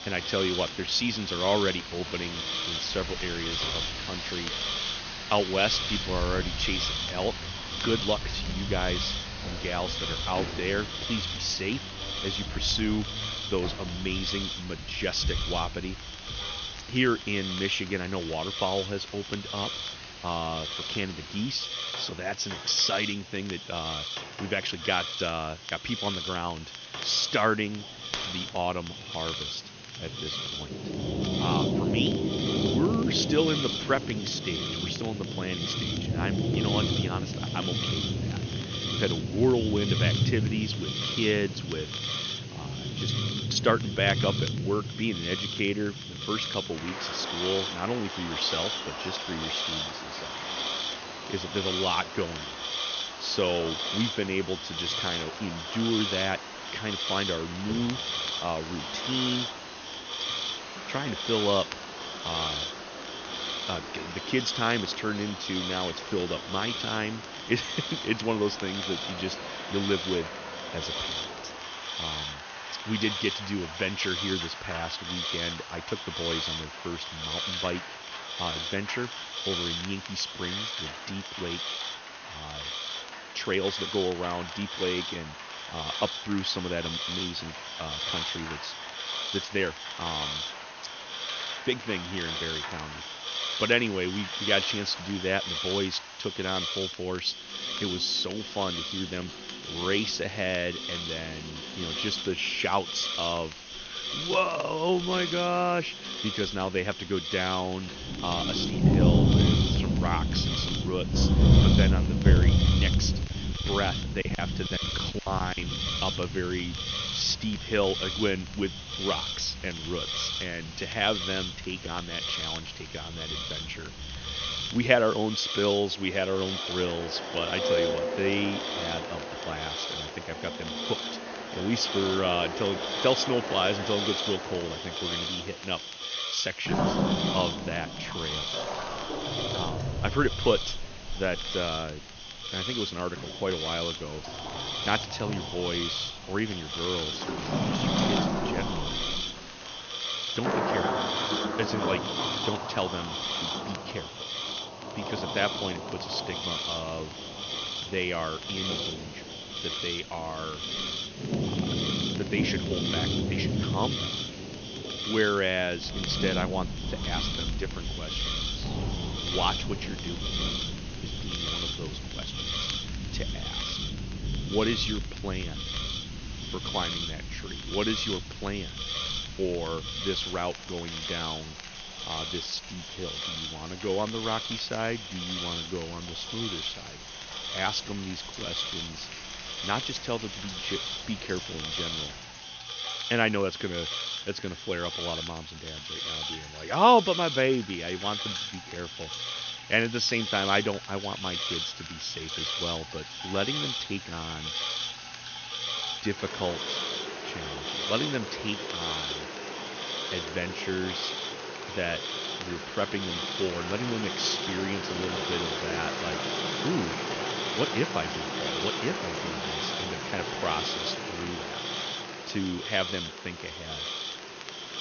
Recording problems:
high frequencies cut off; noticeable; nothing above 6.5 kHz
rain or running water; loud; throughout; 3 dB below the speech
hiss; loud; throughout; 3 dB below the speech
crackle, like an old record; noticeable; 20 dB below the speech
choppy; very; from 1:53 to 1:56; 16% of the speech affected

